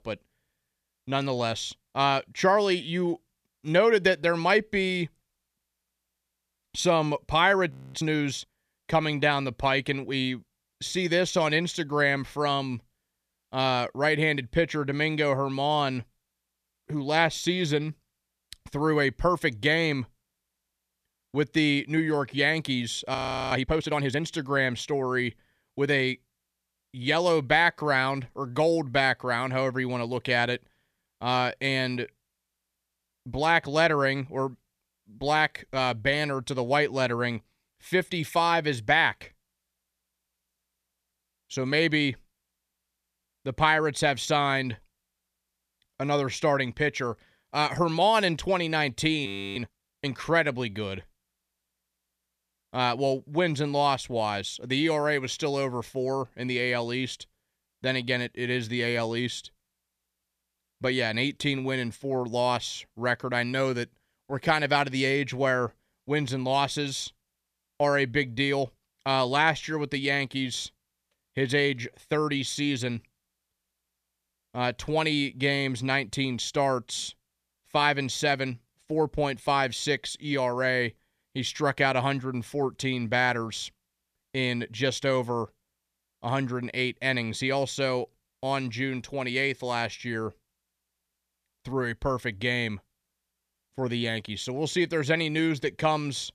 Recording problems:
audio freezing; at 7.5 s, at 23 s and at 49 s

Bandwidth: 14.5 kHz